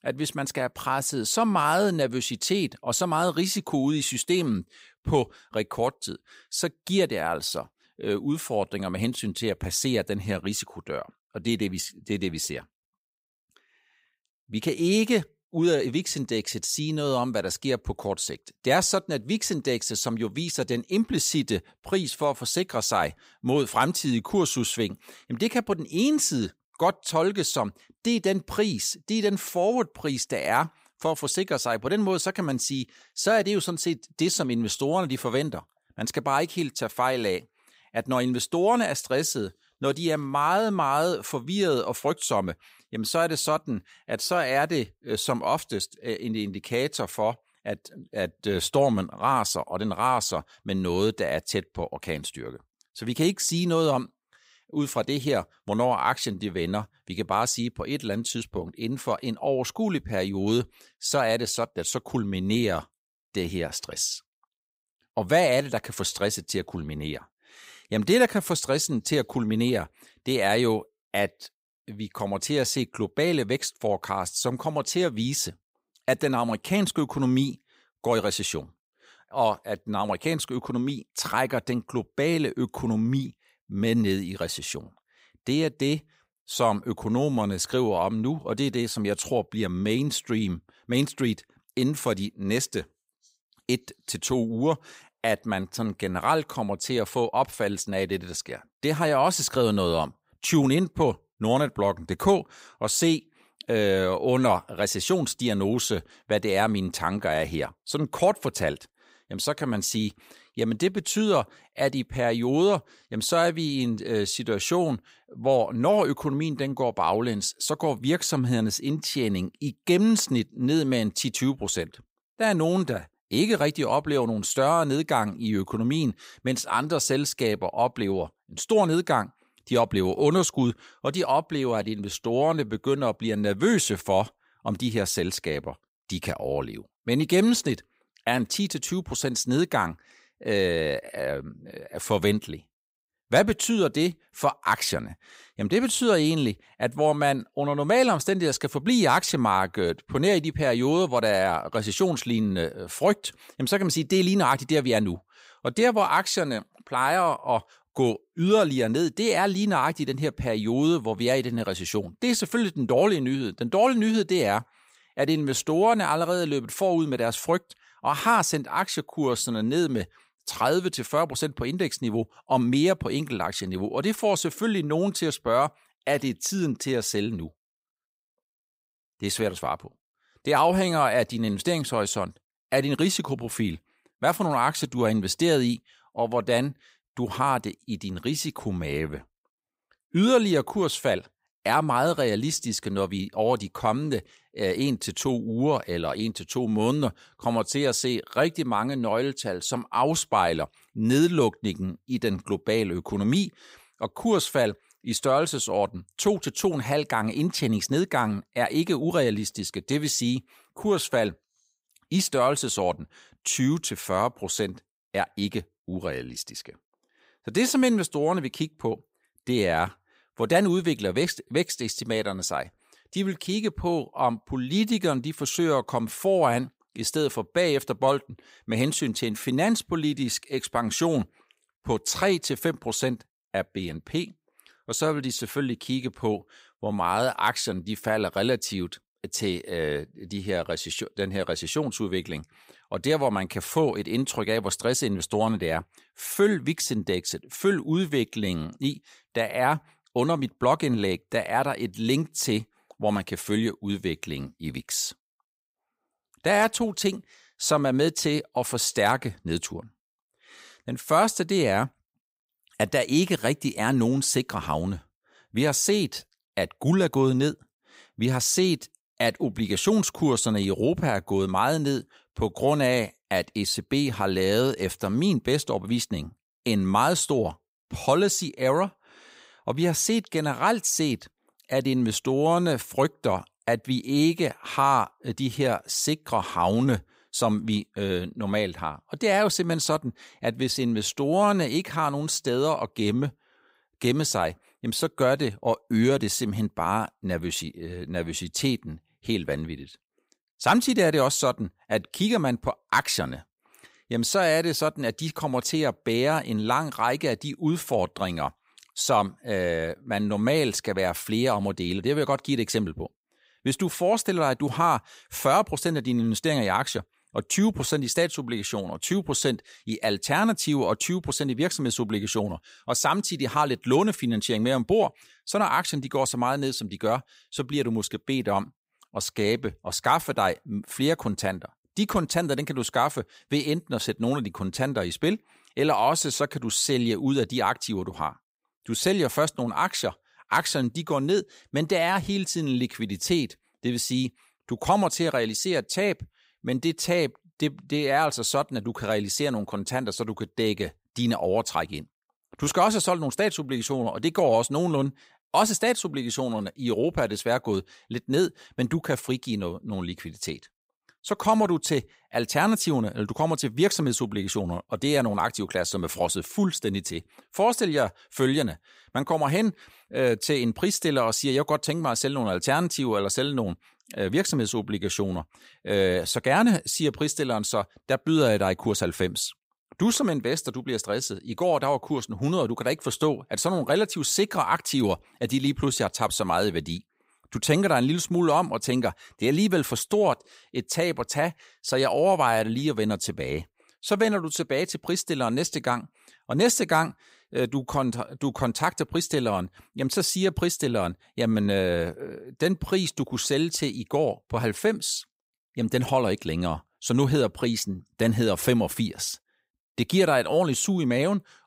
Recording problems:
none

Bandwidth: 15.5 kHz